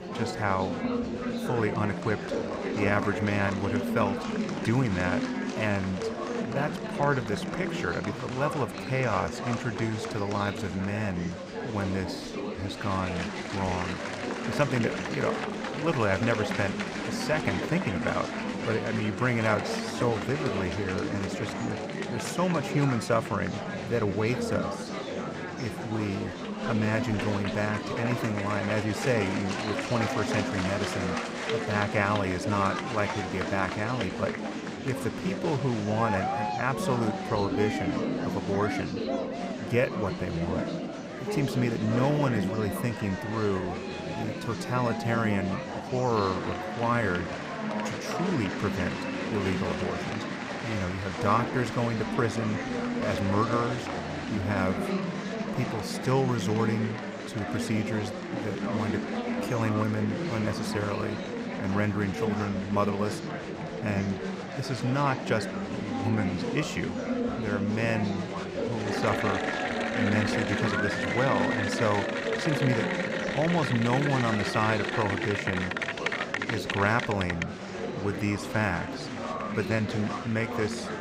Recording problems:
murmuring crowd; loud; throughout; 2 dB below the speech

